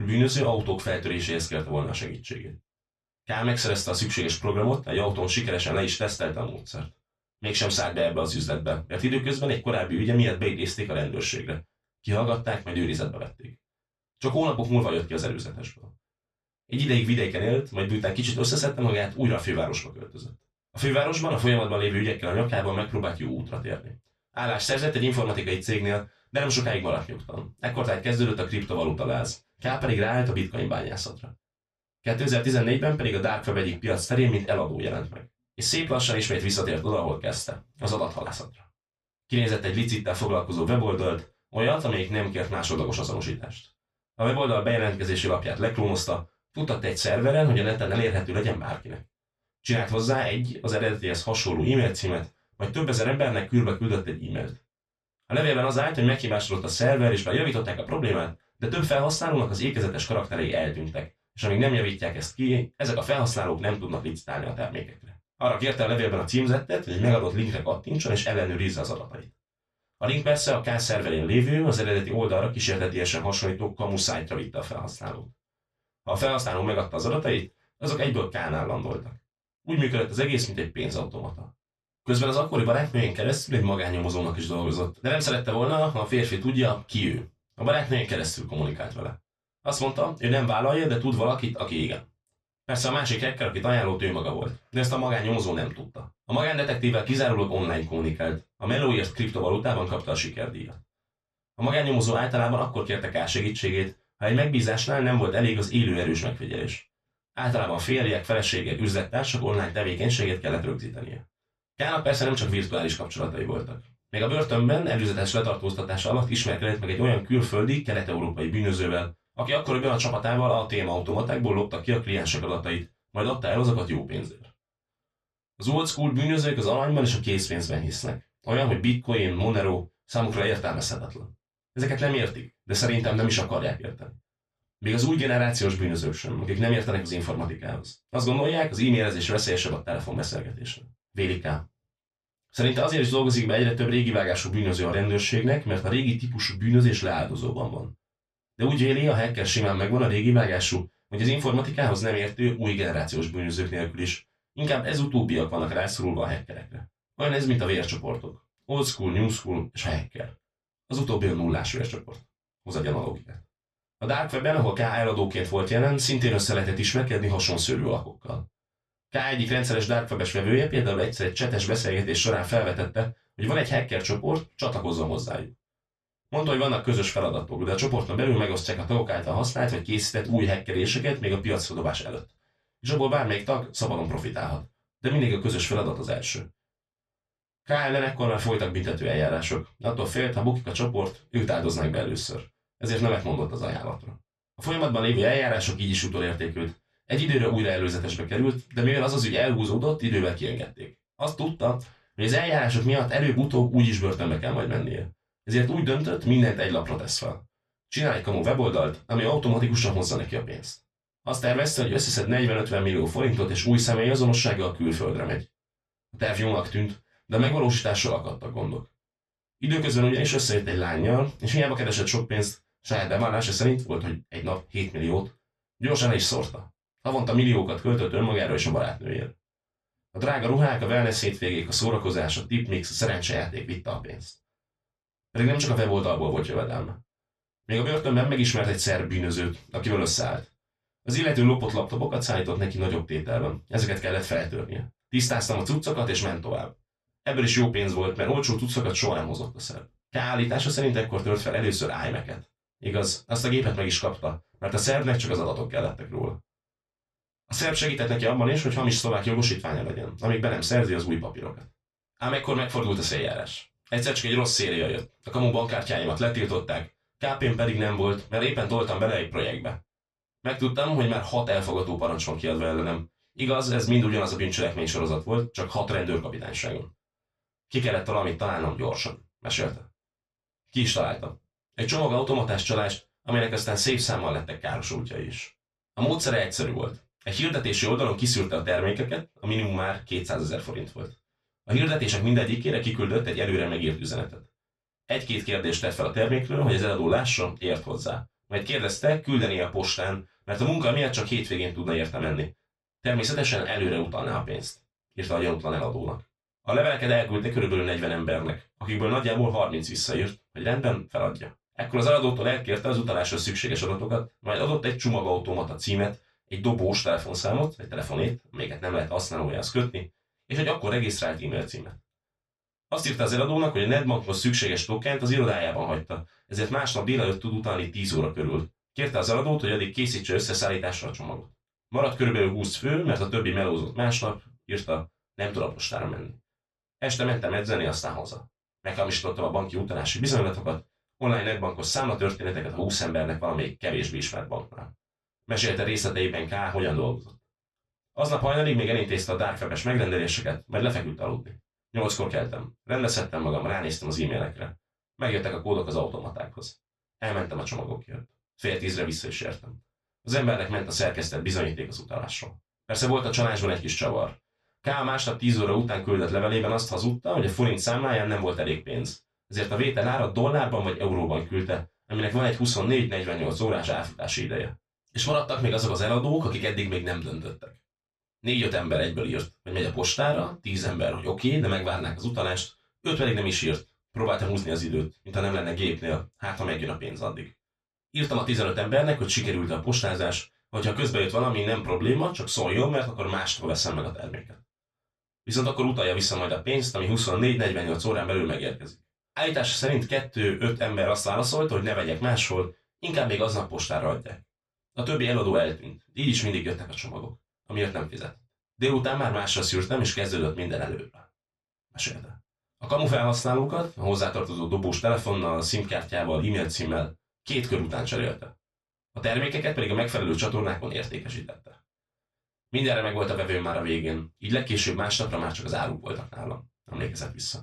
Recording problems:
off-mic speech; far
room echo; slight; dies away in 0.2 s
abrupt cut into speech; at the start

